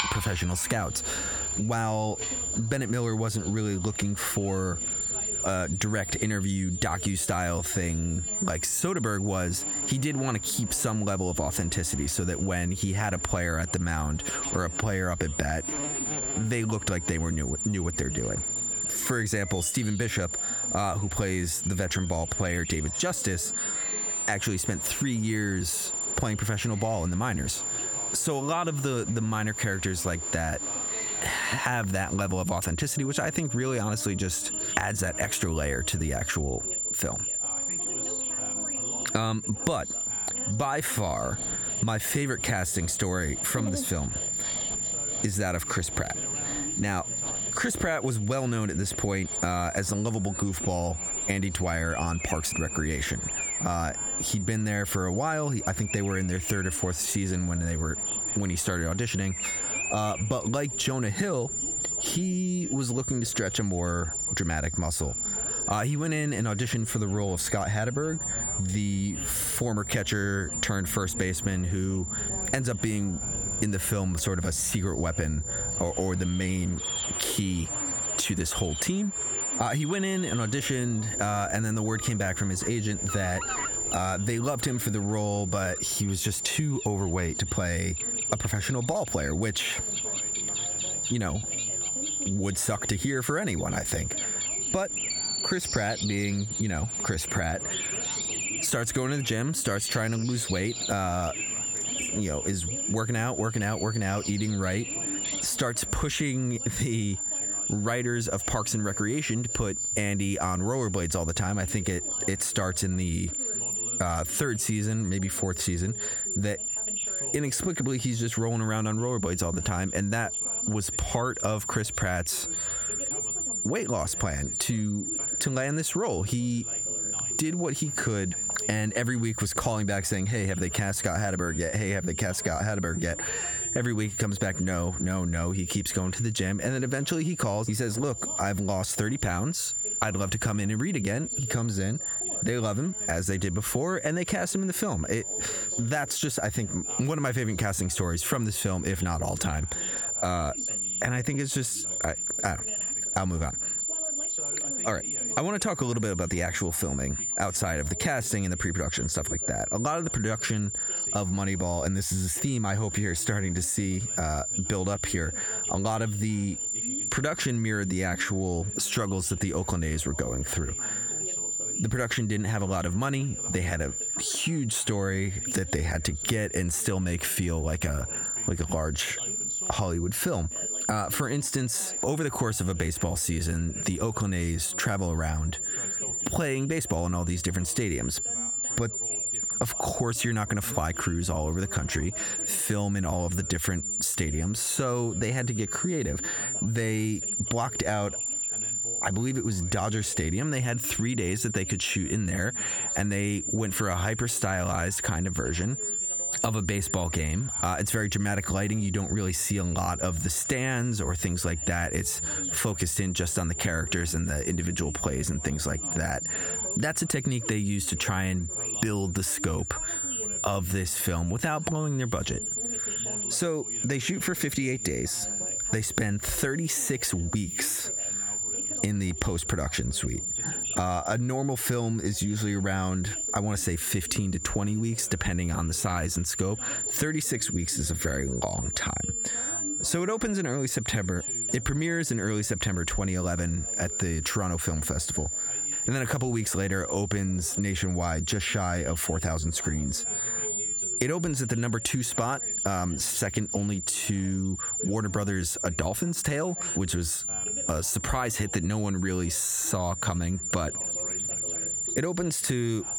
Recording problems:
squashed, flat; somewhat, background pumping
high-pitched whine; loud; throughout; 7 kHz, 3 dB below the speech
animal sounds; noticeable; until 1:46; 15 dB below the speech
background chatter; faint; throughout; 2 voices, 20 dB below the speech

